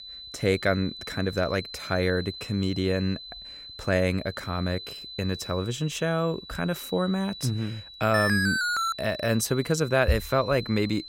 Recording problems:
high-pitched whine; noticeable; throughout; 4 kHz, 10 dB below the speech
alarm; loud; at 8 s; peak 3 dB above the speech

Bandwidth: 16 kHz